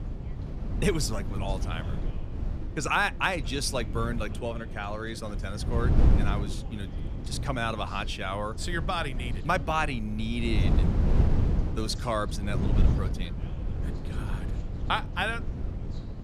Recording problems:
background chatter; noticeable; throughout; 2 voices, 20 dB below the speech
wind noise on the microphone; occasional gusts; 10 dB below the speech

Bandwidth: 14.5 kHz